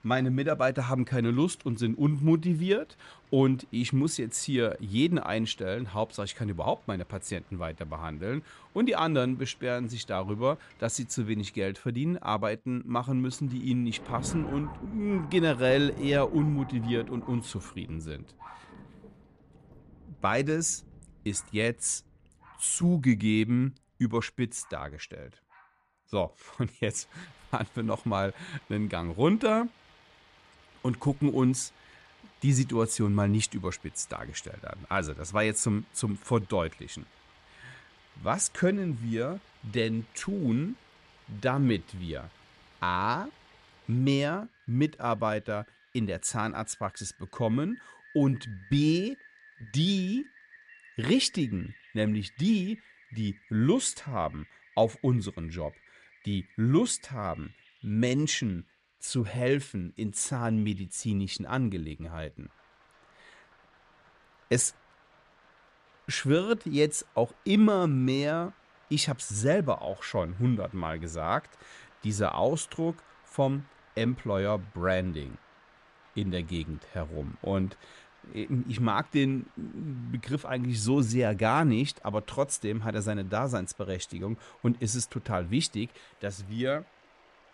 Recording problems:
rain or running water; faint; throughout; 25 dB below the speech

